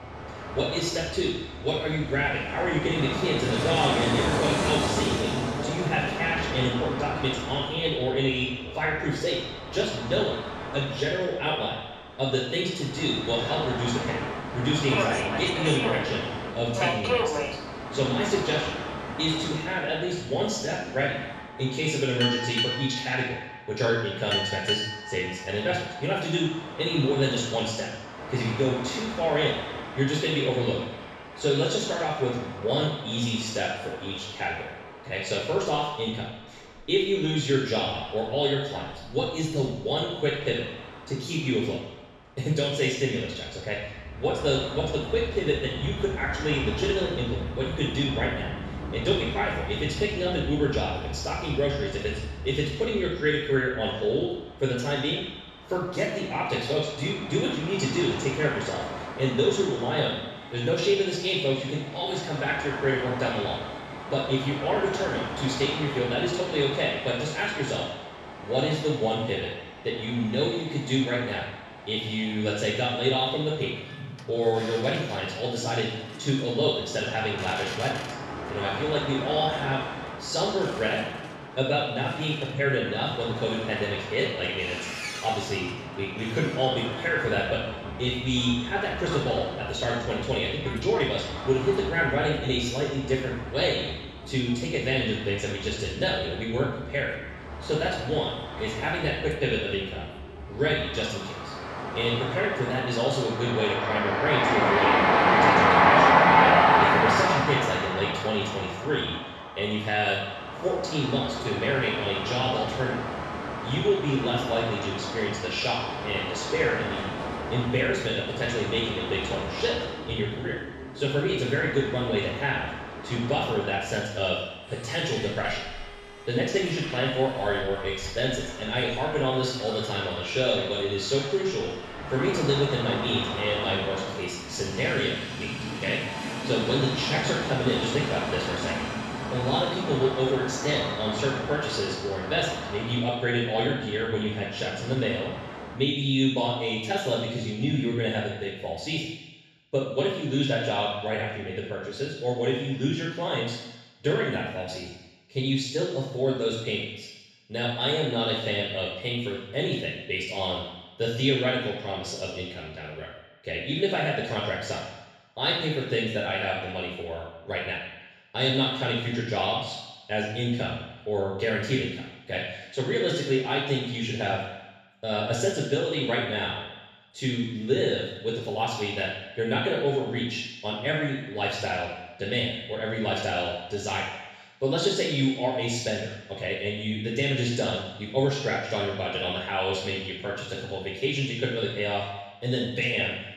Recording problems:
room echo; strong; dies away in 1.1 s
off-mic speech; far
train or aircraft noise; loud; until 2:26; 3 dB below the speech

